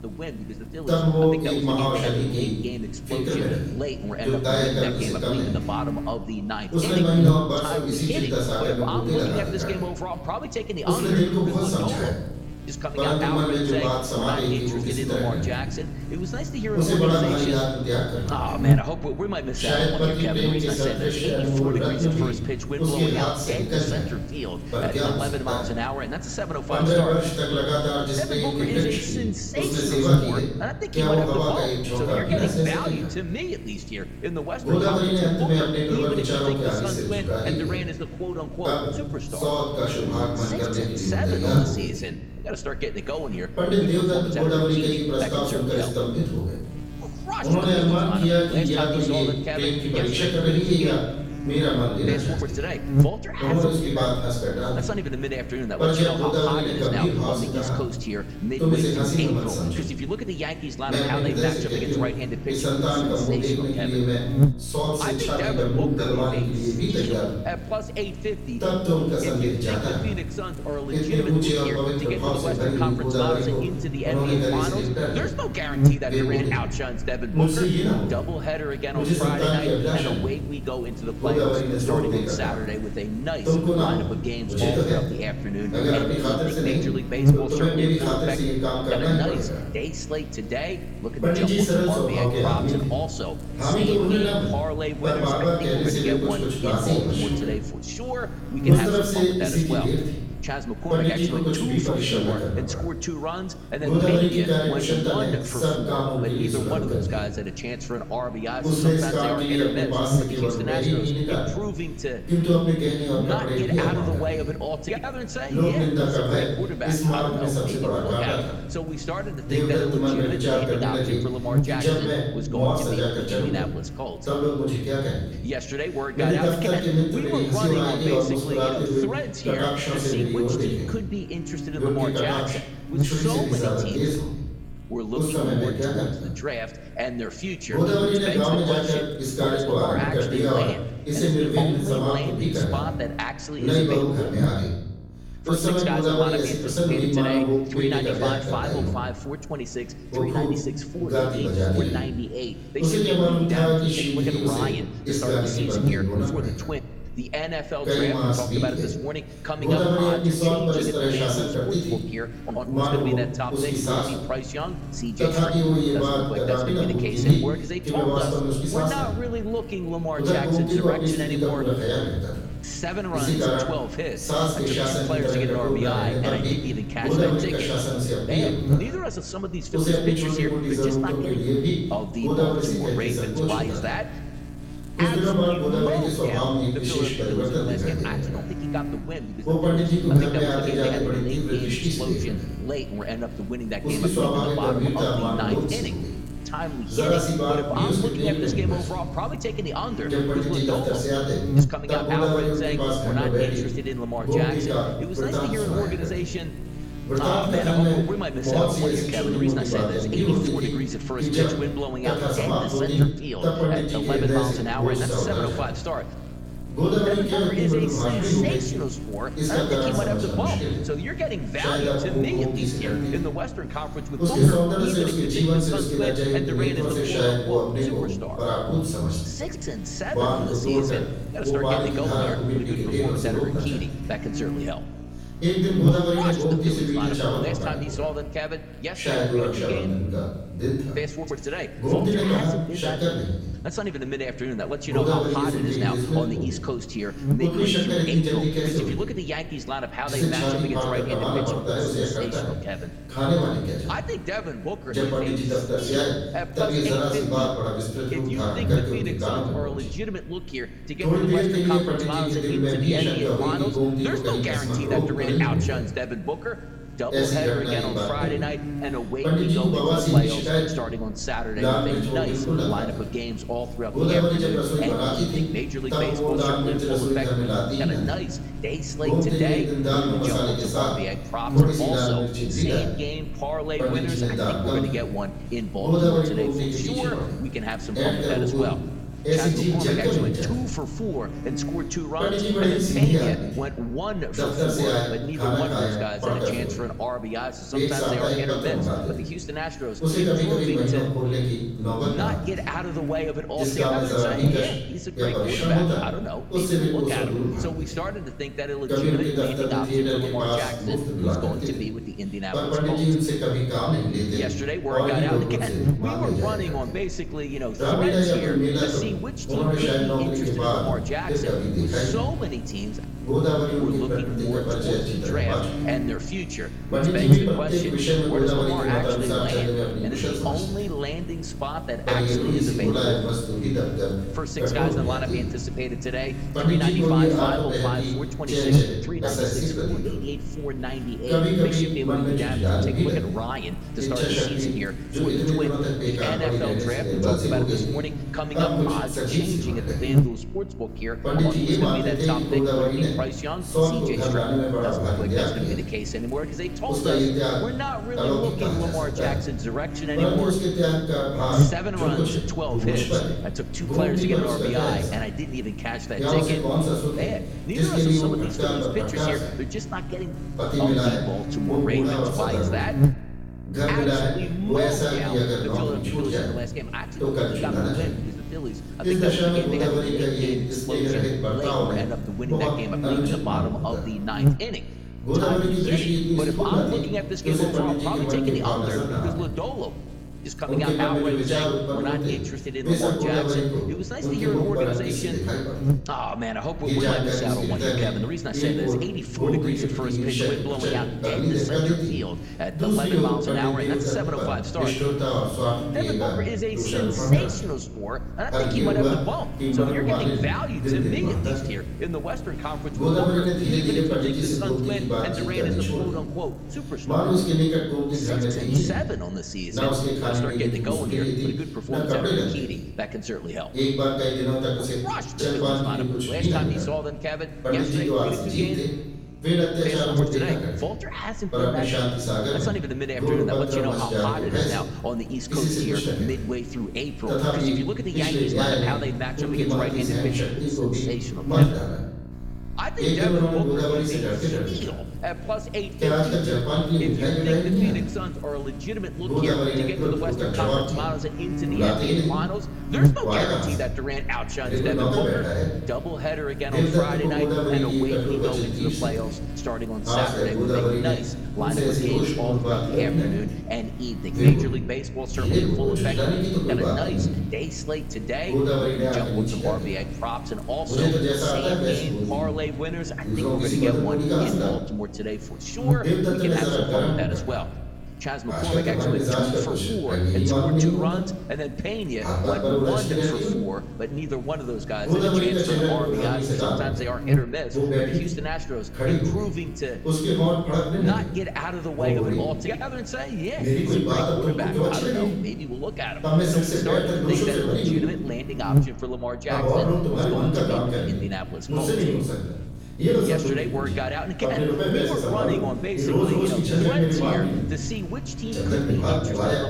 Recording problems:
off-mic speech; far
room echo; noticeable; dies away in 0.8 s
voice in the background; loud; throughout; 7 dB below the speech
electrical hum; noticeable; throughout; 60 Hz, 15 dB below the speech

